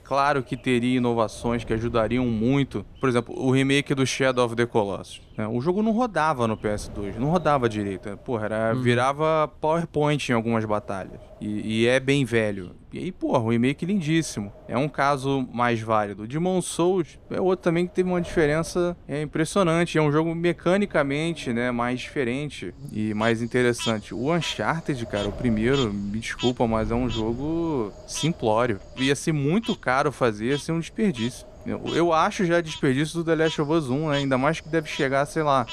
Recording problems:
animal sounds; noticeable; throughout; 15 dB below the speech
wind noise on the microphone; occasional gusts; 20 dB below the speech

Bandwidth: 14.5 kHz